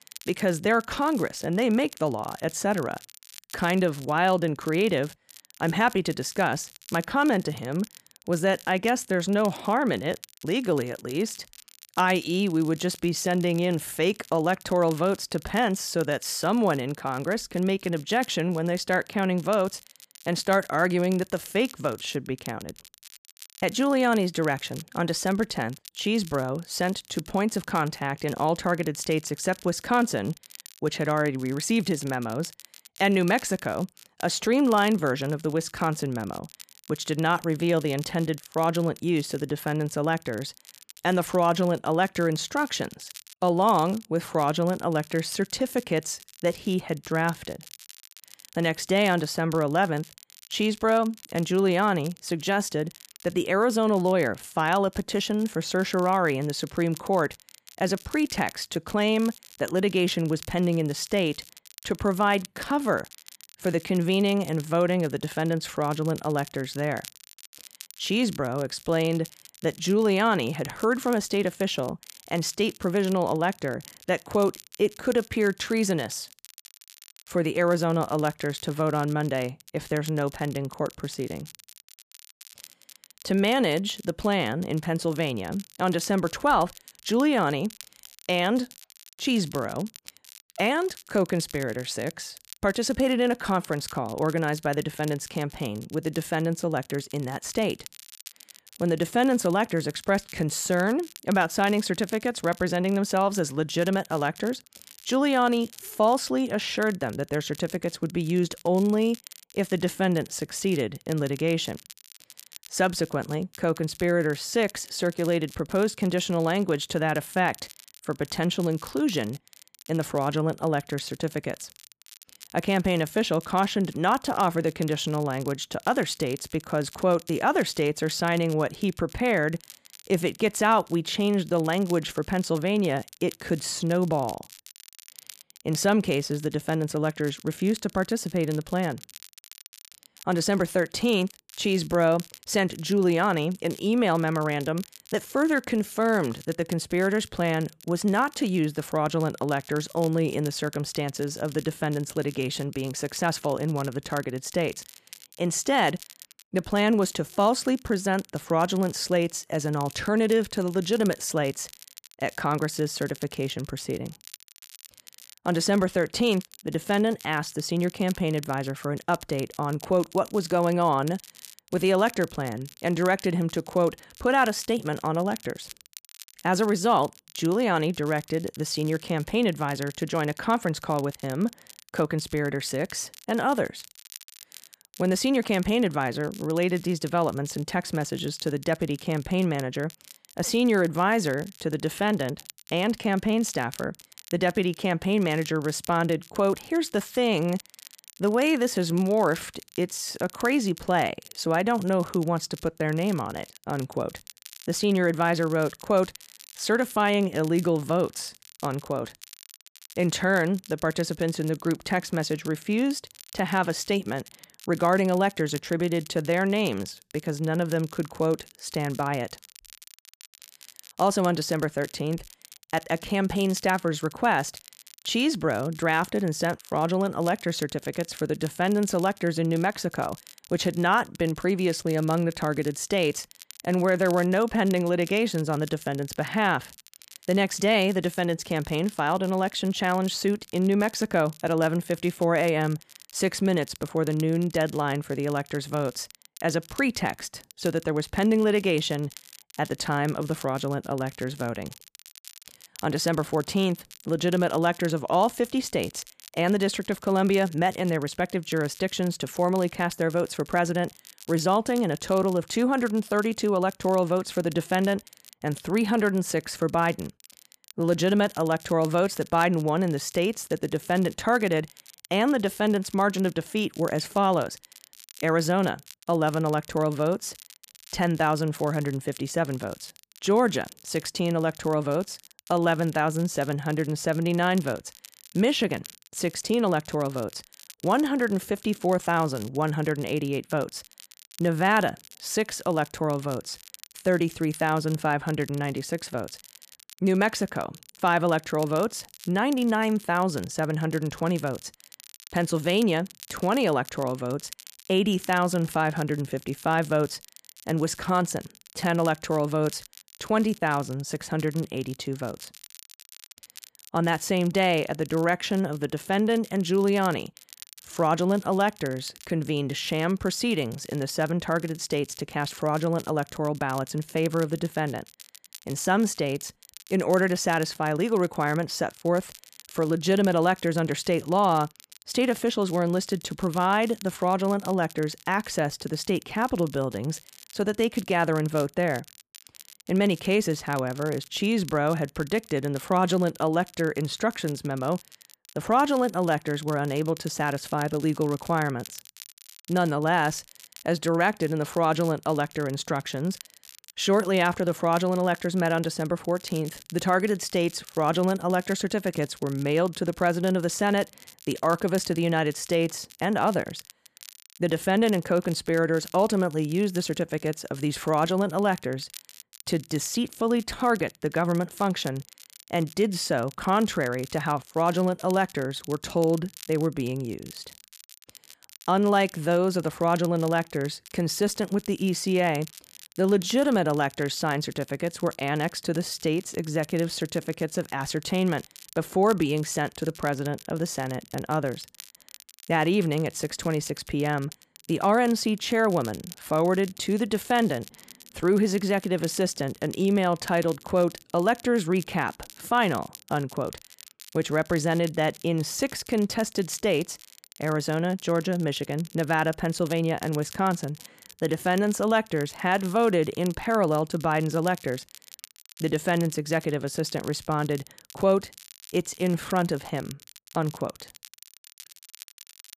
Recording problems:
crackle, like an old record; faint; 20 dB below the speech

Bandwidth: 14.5 kHz